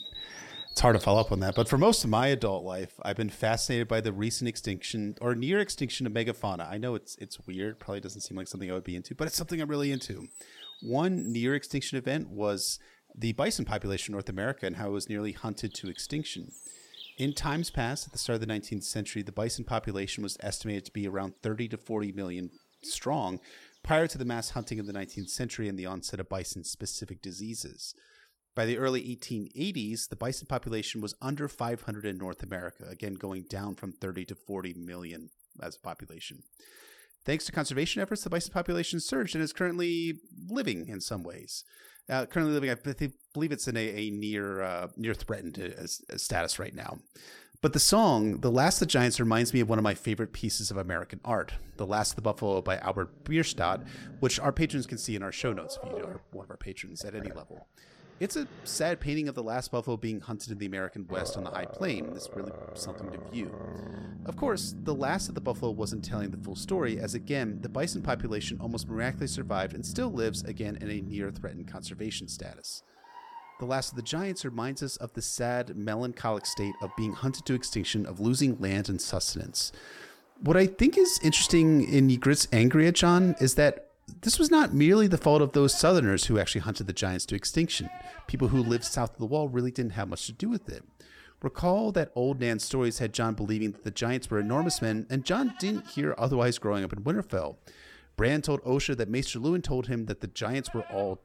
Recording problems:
animal sounds; noticeable; throughout; 15 dB below the speech

